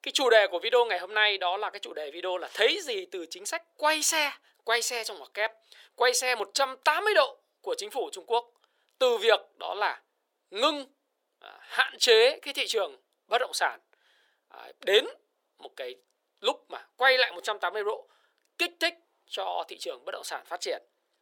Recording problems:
thin; very; fading below 450 Hz

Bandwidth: 17 kHz